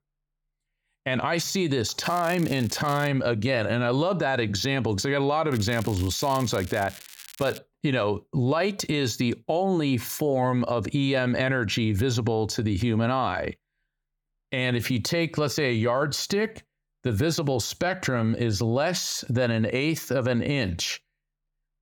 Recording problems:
crackling; noticeable; from 2 to 3 s and from 5.5 to 7.5 s; 15 dB below the speech

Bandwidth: 18 kHz